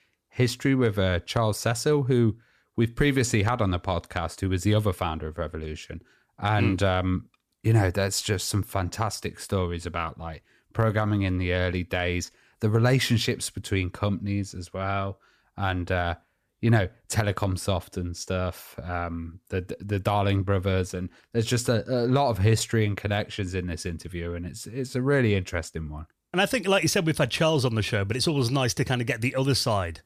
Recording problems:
none

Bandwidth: 14.5 kHz